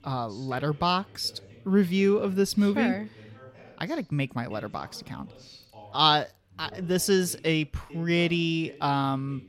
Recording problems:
background chatter; faint; throughout; 2 voices, 25 dB below the speech

